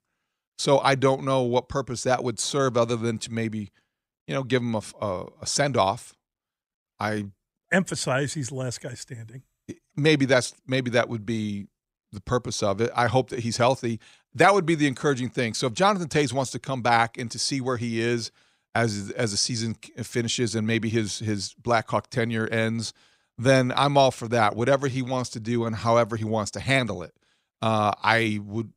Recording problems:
none

